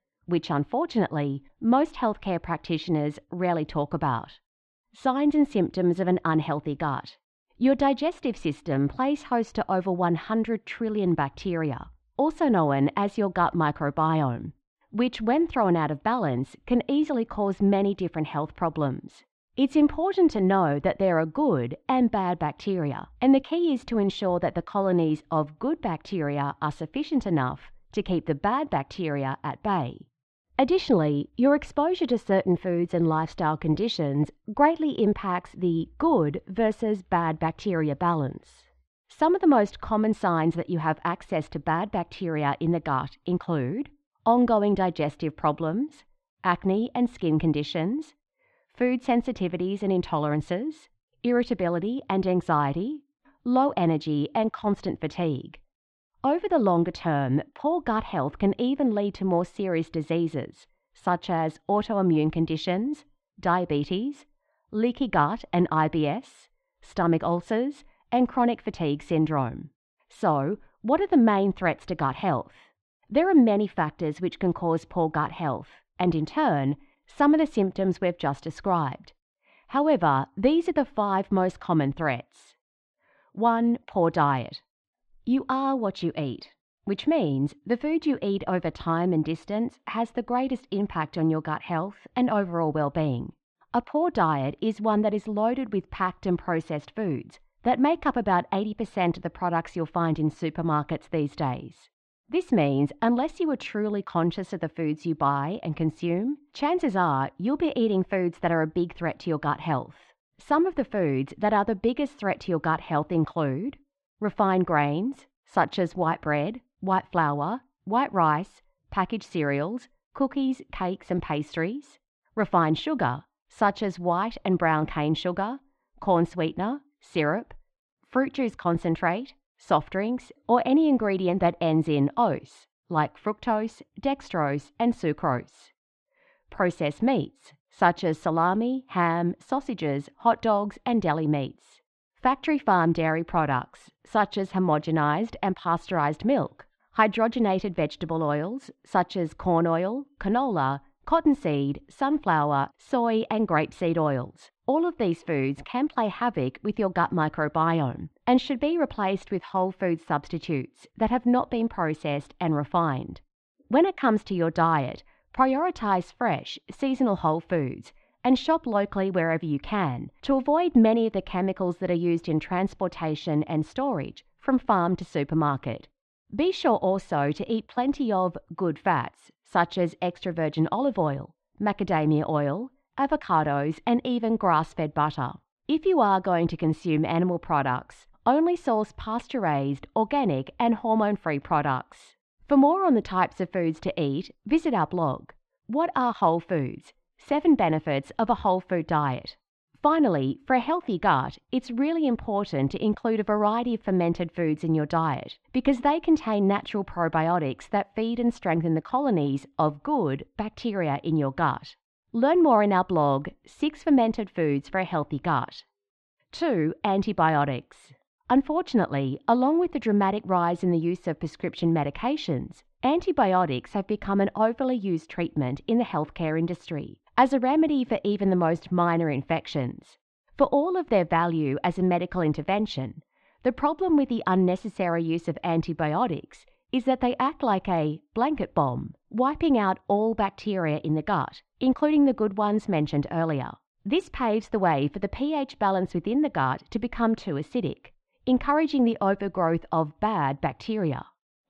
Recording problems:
muffled; slightly; fading above 3.5 kHz

